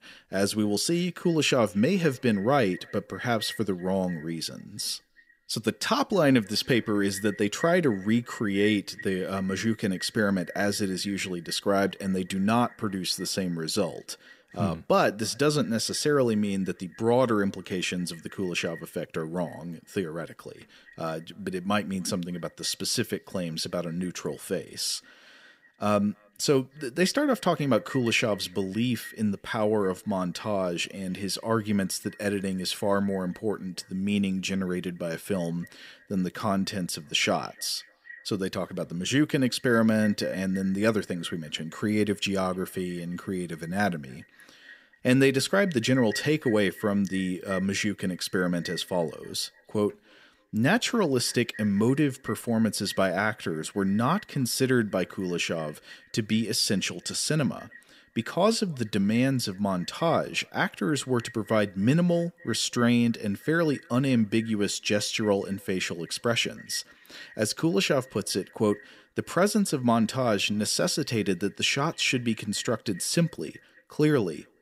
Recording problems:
echo of what is said; faint; throughout; 300 ms later, 20 dB below the speech

